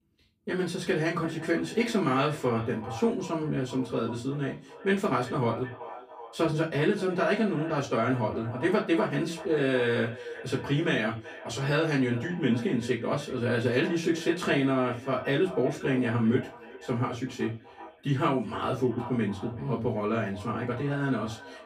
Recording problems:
off-mic speech; far
echo of what is said; noticeable; throughout; 380 ms later, 15 dB below the speech
room echo; very slight; dies away in 0.2 s

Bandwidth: 15 kHz